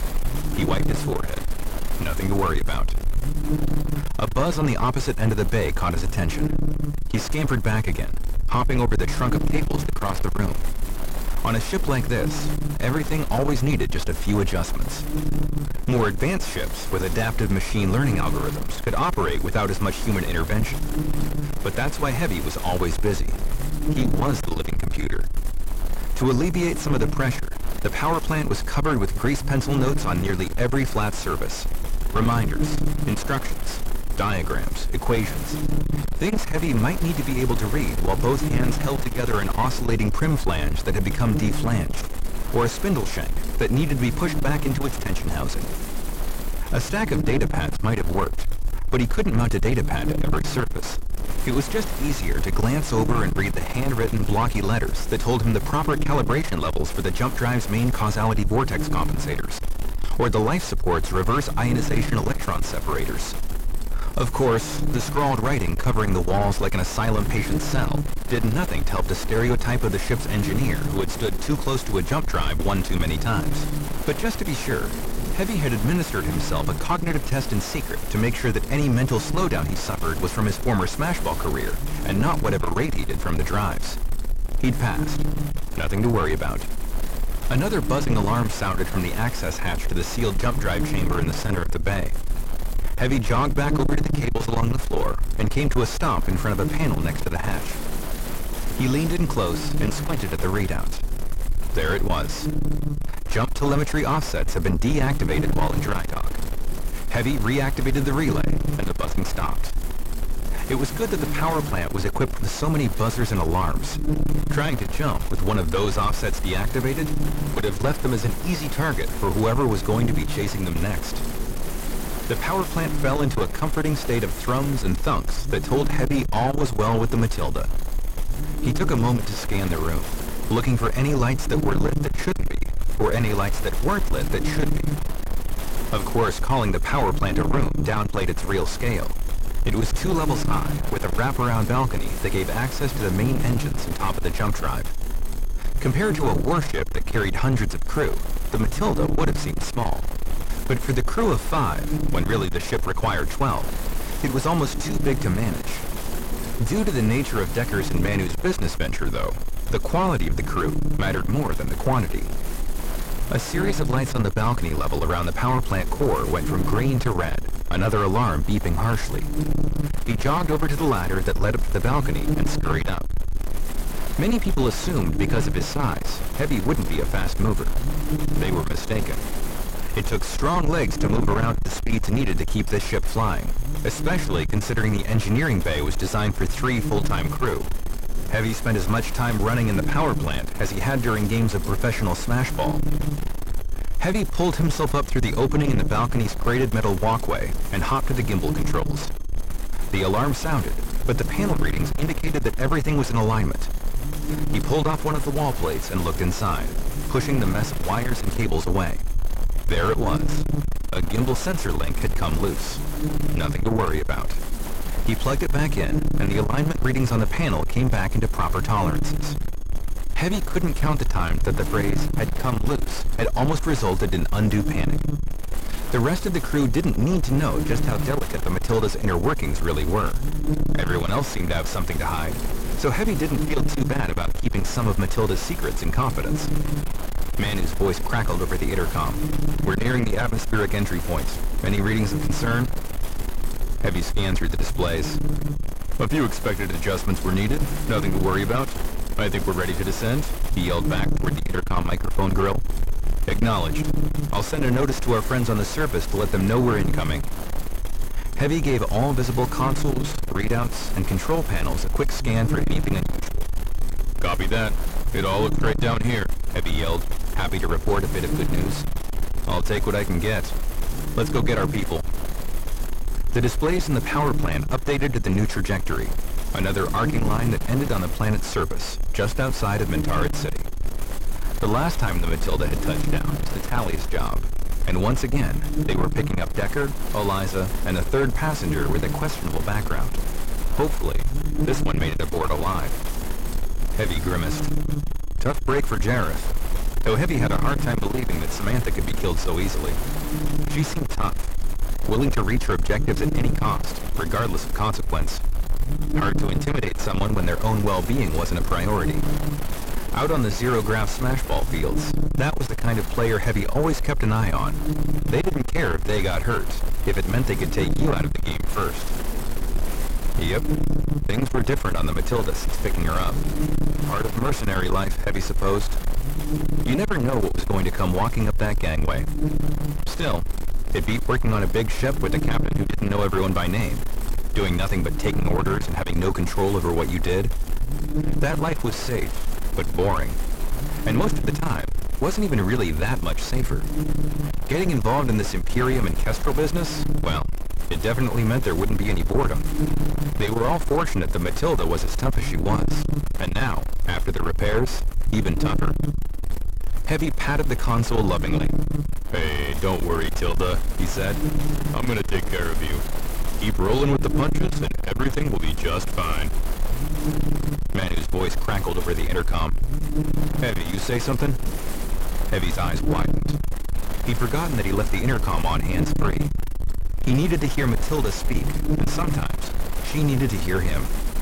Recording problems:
distortion; heavy; 7 dB below the speech
electrical hum; loud; throughout; 50 Hz, 8 dB below the speech
wind noise on the microphone; occasional gusts; 10 dB below the speech
high-pitched whine; faint; from 2:00 to 5:05; 6.5 kHz, 30 dB below the speech

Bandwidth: 16 kHz